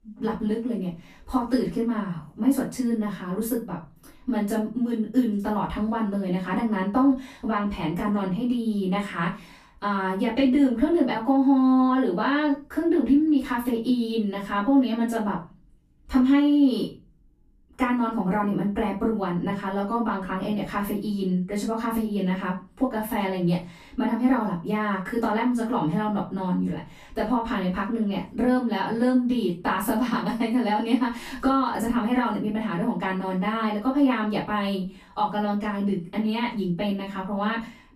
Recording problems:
off-mic speech; far
room echo; slight; dies away in 0.3 s

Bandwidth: 14.5 kHz